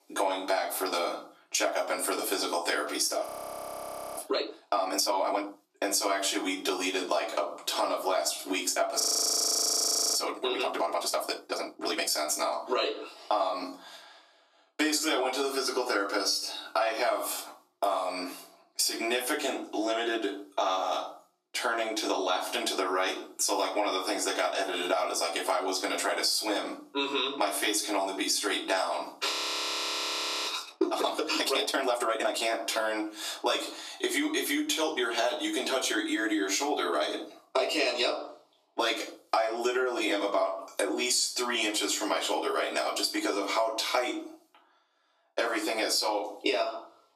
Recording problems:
off-mic speech; far
thin; very; fading below 300 Hz
room echo; slight; dies away in 0.4 s
squashed, flat; somewhat
audio freezing; at 3.5 s for 1 s, at 9 s for 1 s and at 29 s for 1 s

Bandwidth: 14.5 kHz